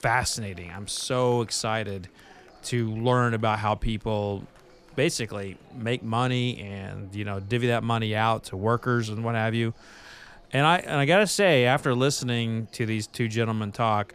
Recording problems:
murmuring crowd; faint; throughout; 30 dB below the speech

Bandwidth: 14.5 kHz